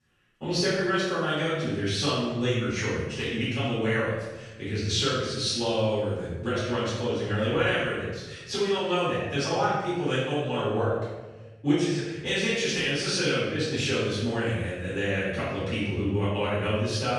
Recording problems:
room echo; strong; dies away in 1 s
off-mic speech; far

